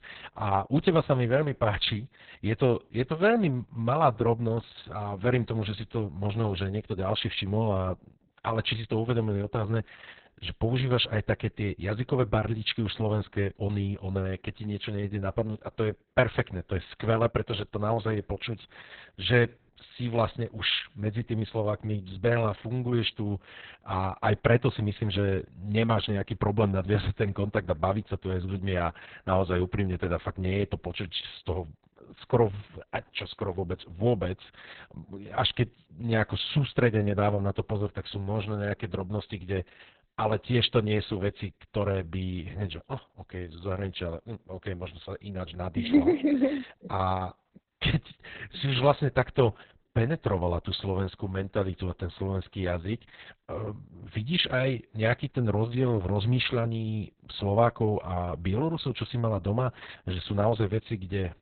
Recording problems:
garbled, watery; badly; nothing above 4 kHz

